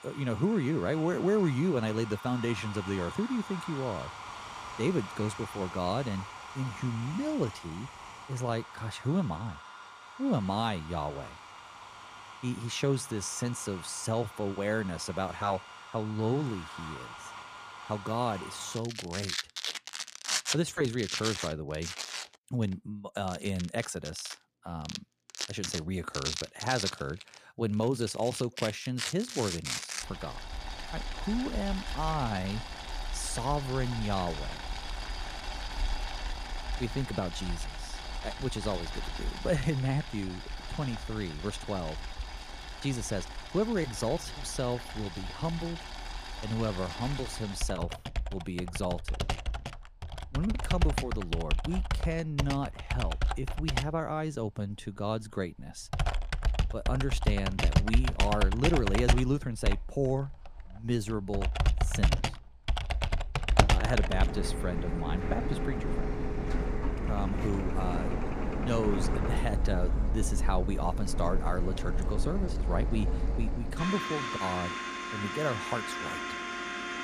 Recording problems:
household noises; loud; throughout; 2 dB below the speech

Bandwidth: 15 kHz